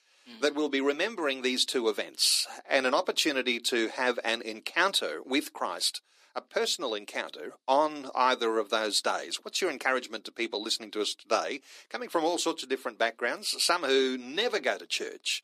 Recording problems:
thin; somewhat; fading below 300 Hz

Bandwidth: 14.5 kHz